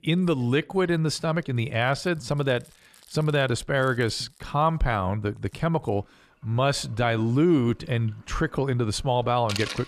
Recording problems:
household noises; noticeable; throughout; 20 dB below the speech

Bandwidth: 14 kHz